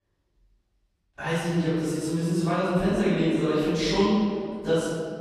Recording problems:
room echo; strong; dies away in 1.9 s
off-mic speech; far

